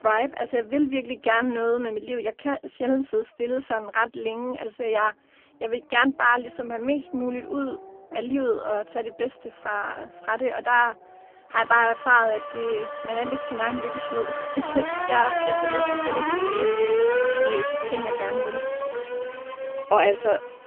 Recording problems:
phone-call audio; poor line; nothing above 3 kHz
traffic noise; loud; throughout; 2 dB below the speech

